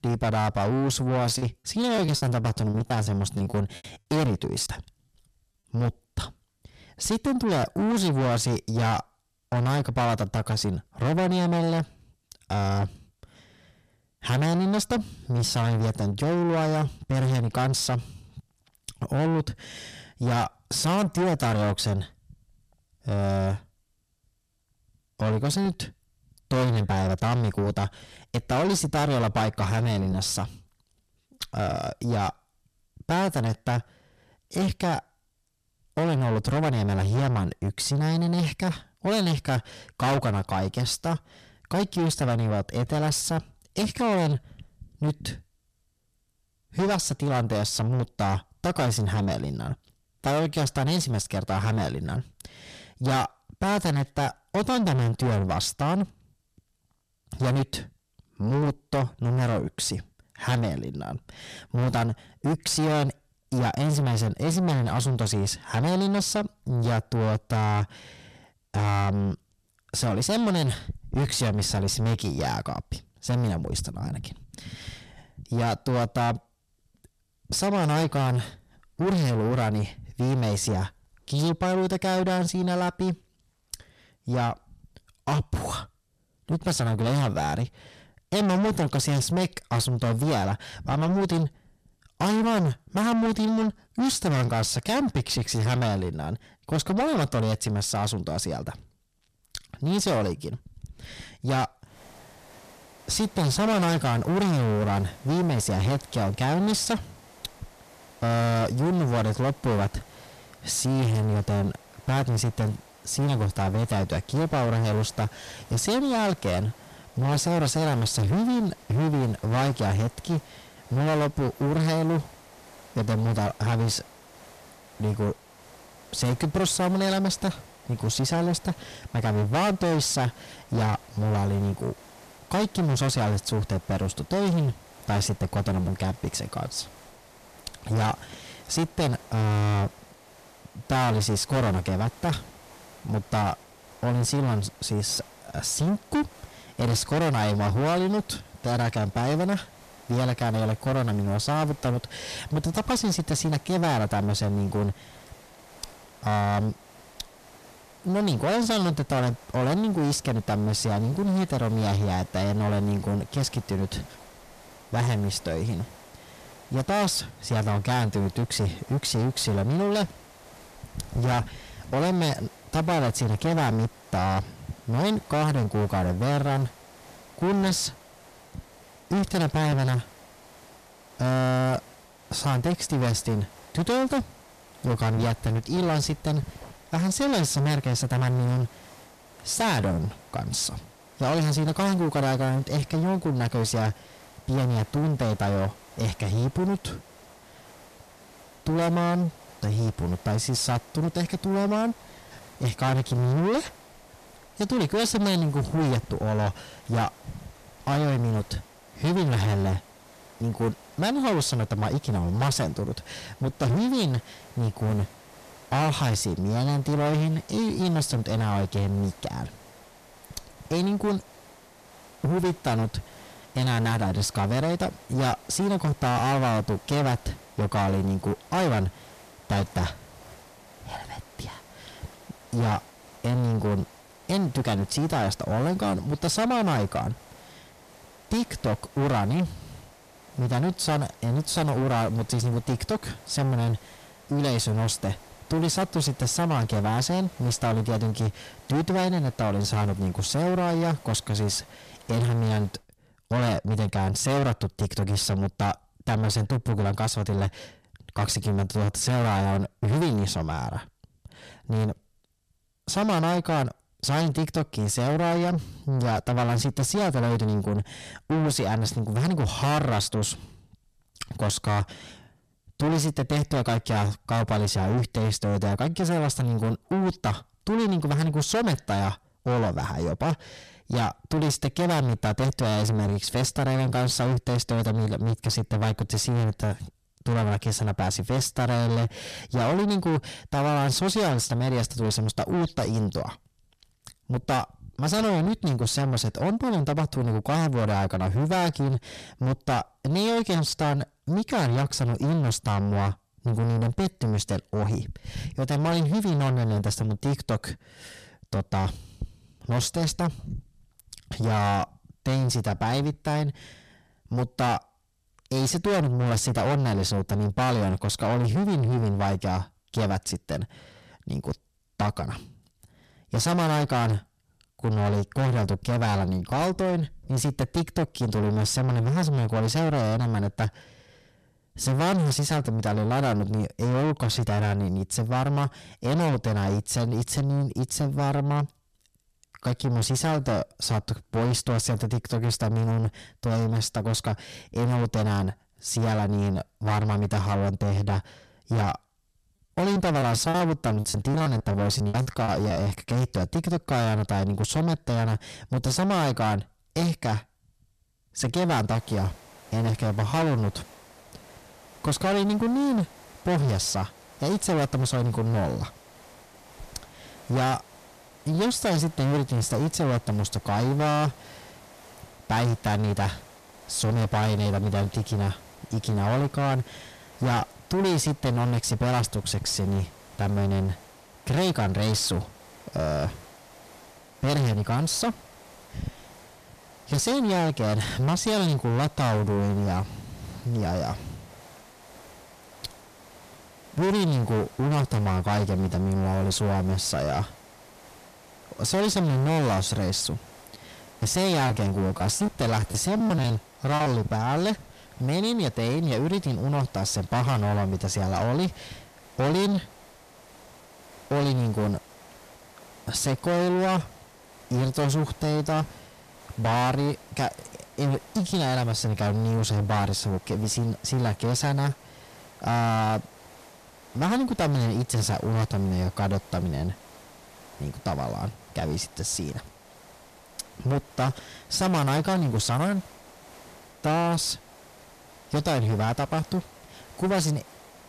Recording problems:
distortion; heavy; 6 dB below the speech
hiss; faint; from 1:42 to 4:13 and from 5:59 on; 25 dB below the speech
choppy; very; from 1.5 to 4.5 s, from 5:50 to 5:53 and from 6:41 to 6:44; 14% of the speech affected

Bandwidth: 14.5 kHz